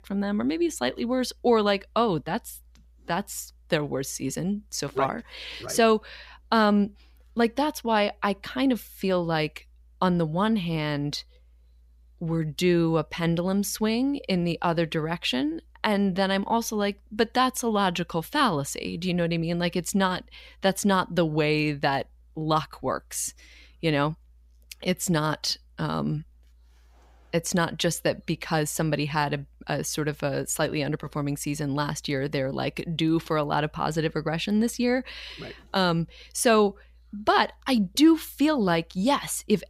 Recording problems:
none

